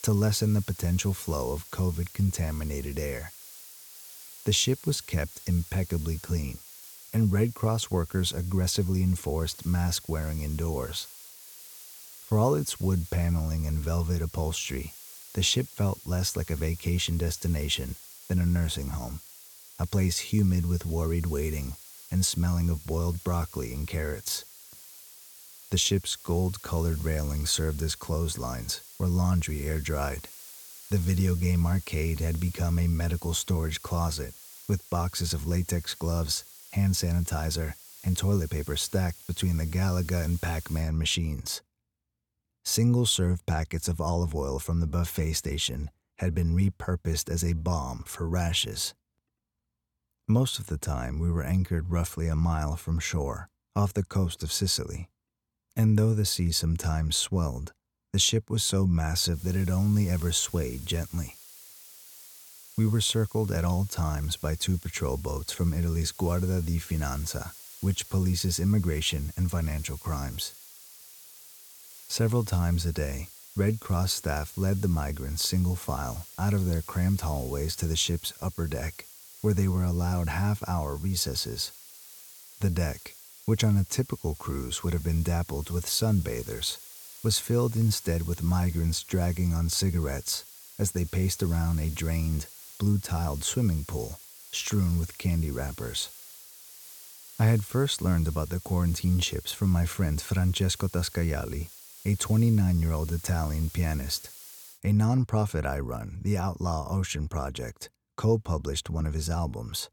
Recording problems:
hiss; noticeable; until 41 s and from 59 s to 1:45; 15 dB below the speech

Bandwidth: 18.5 kHz